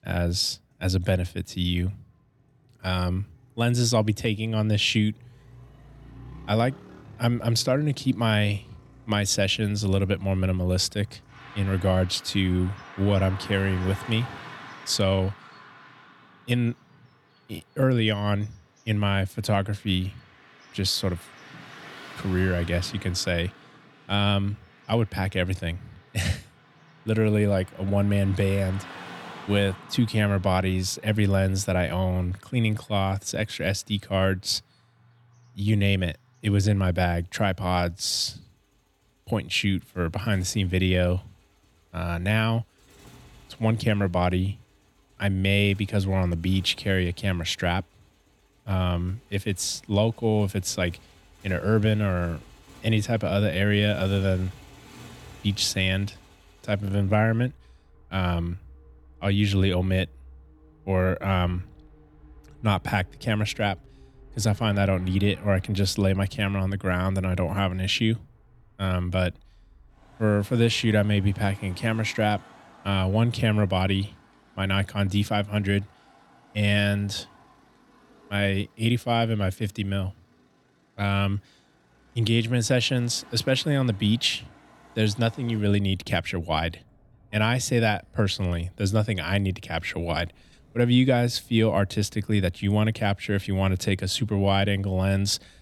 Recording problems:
traffic noise; faint; throughout; 25 dB below the speech

